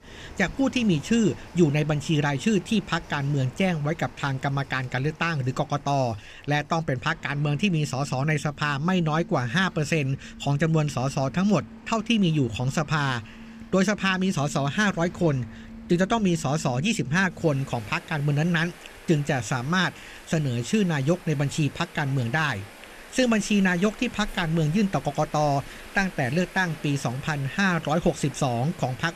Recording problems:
rain or running water; noticeable; throughout; 20 dB below the speech

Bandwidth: 14.5 kHz